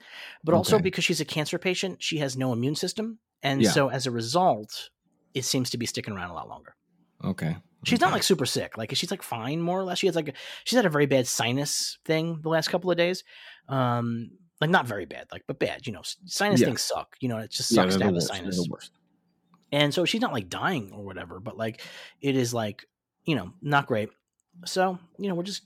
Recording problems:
none

